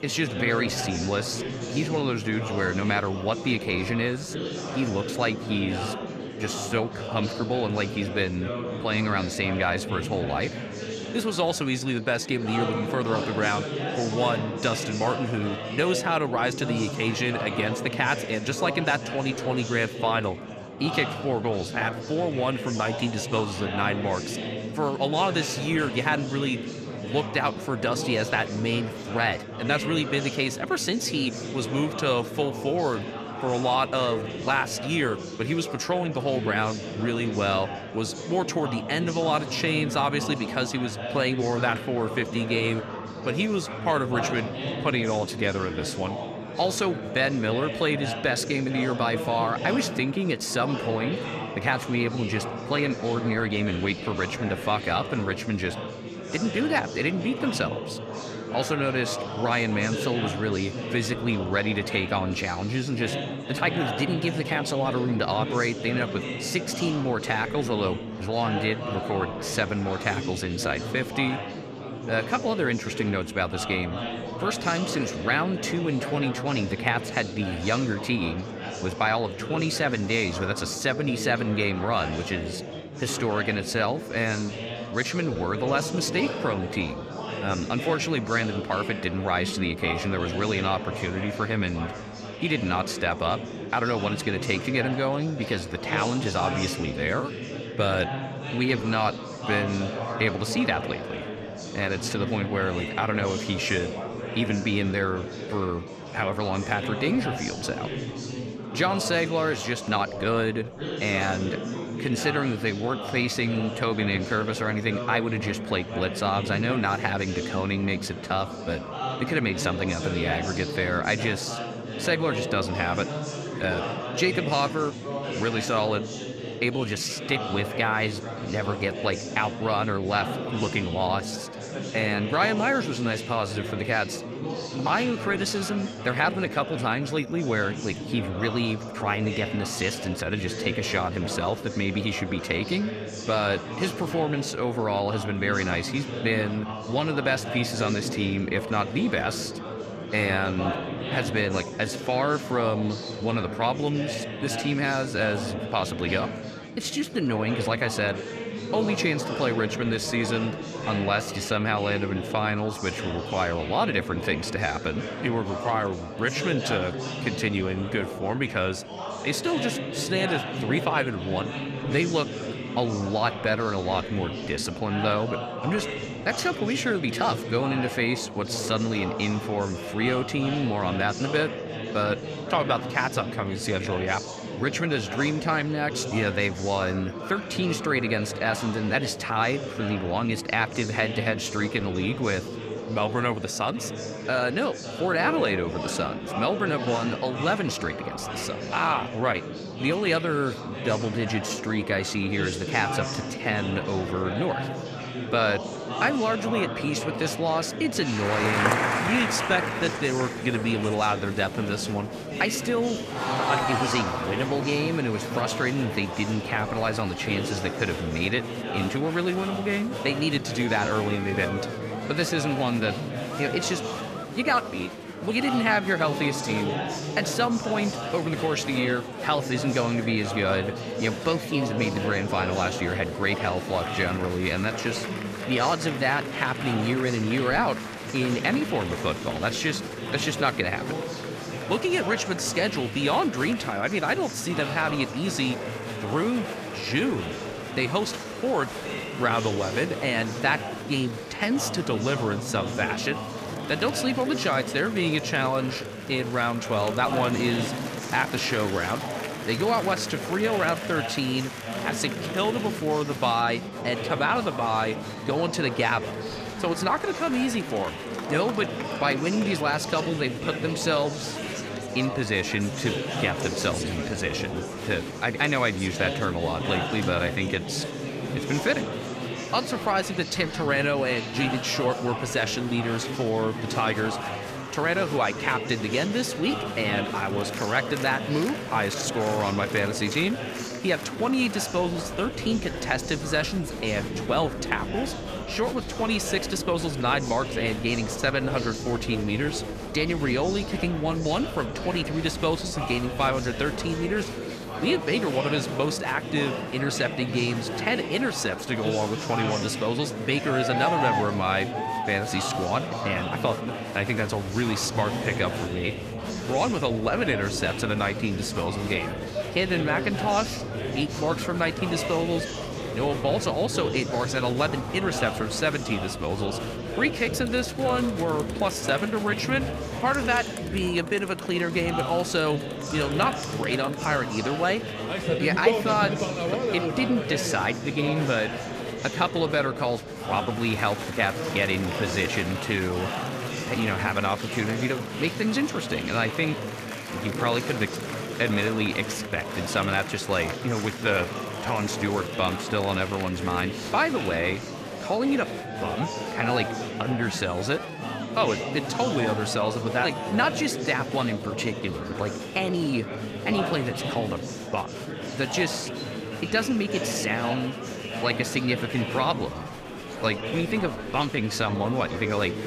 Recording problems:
murmuring crowd; loud; throughout; 5 dB below the speech

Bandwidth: 14.5 kHz